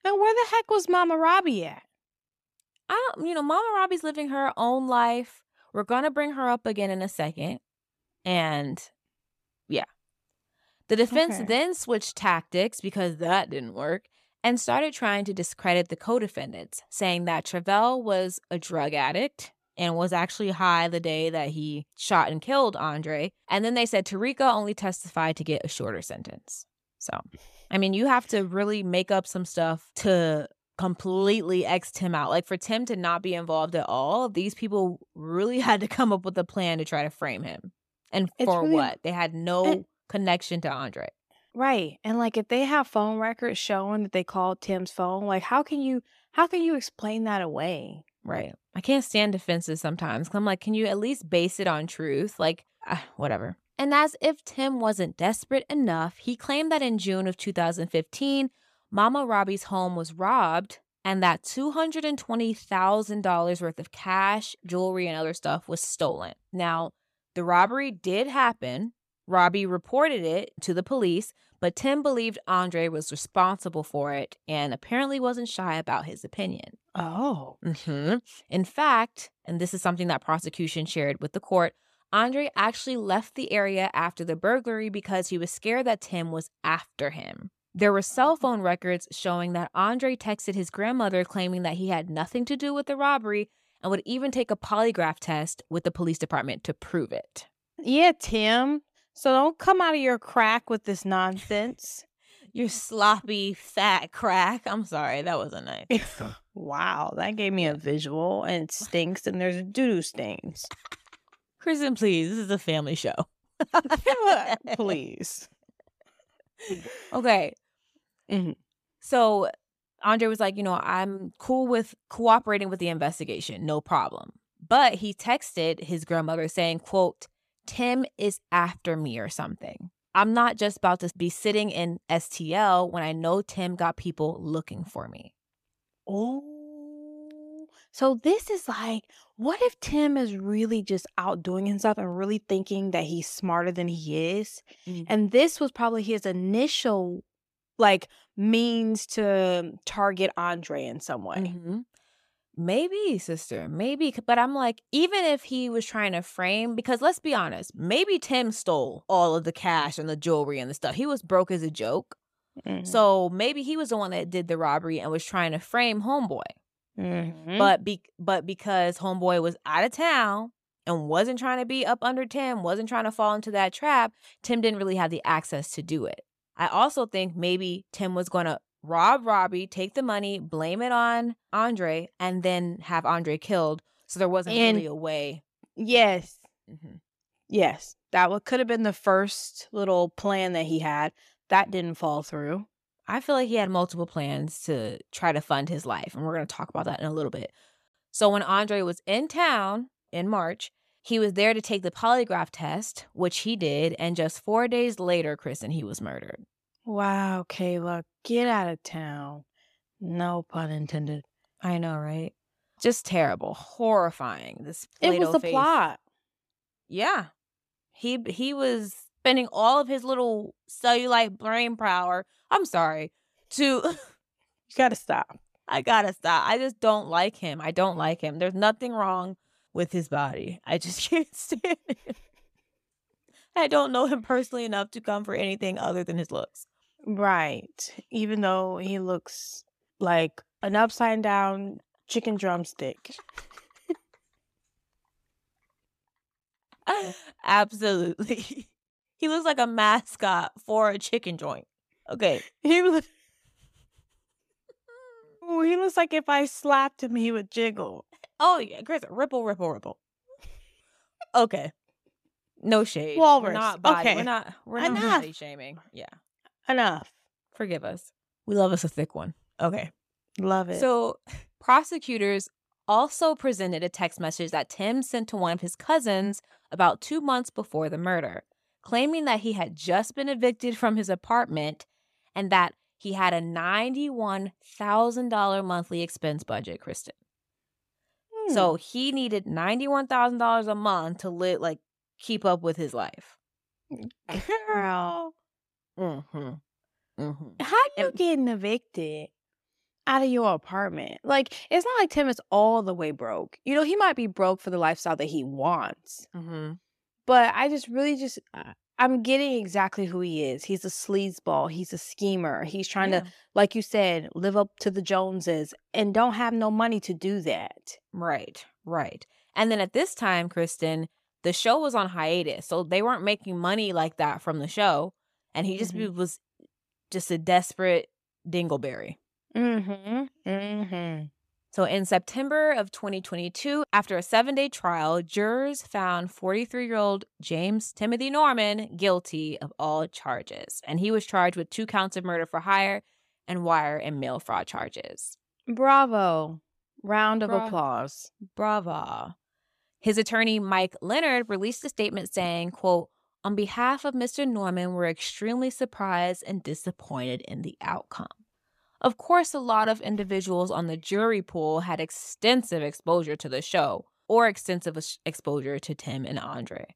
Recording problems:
none

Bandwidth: 14.5 kHz